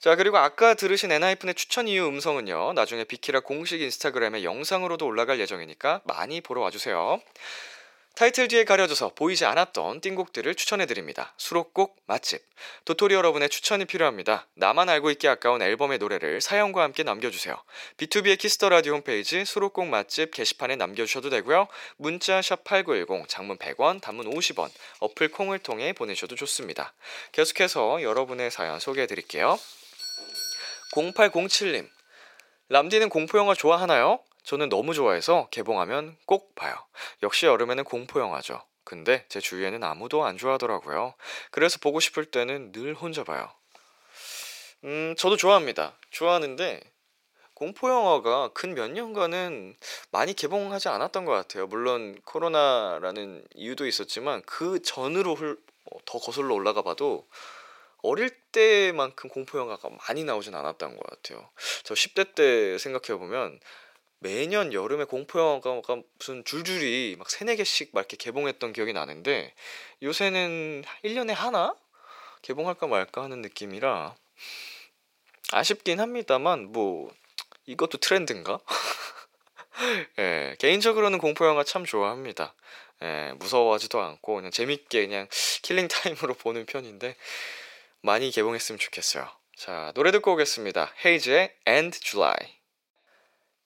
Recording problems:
thin; very; fading below 550 Hz
doorbell; noticeable; from 30 to 31 s; peak 5 dB below the speech

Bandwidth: 16.5 kHz